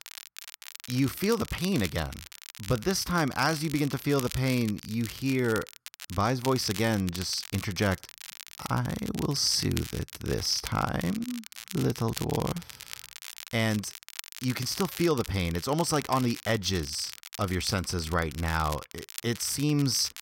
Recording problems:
crackle, like an old record; noticeable; 15 dB below the speech

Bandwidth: 16 kHz